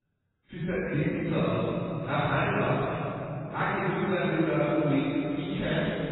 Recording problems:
room echo; strong; dies away in 3 s
off-mic speech; far
garbled, watery; badly; nothing above 4 kHz

